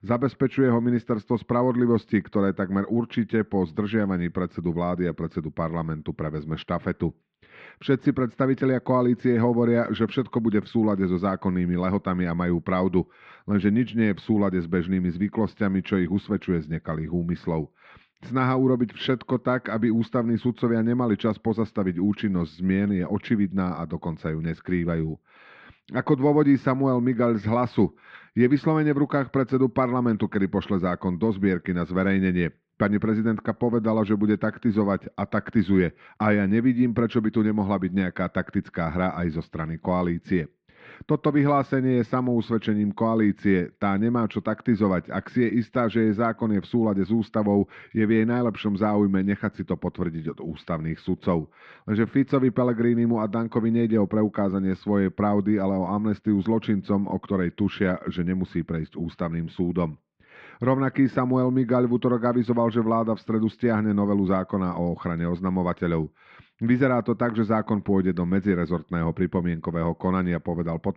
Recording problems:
muffled; very; fading above 2.5 kHz

